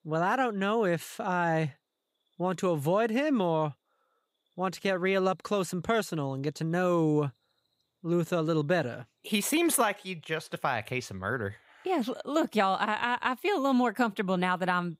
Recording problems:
none

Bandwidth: 15.5 kHz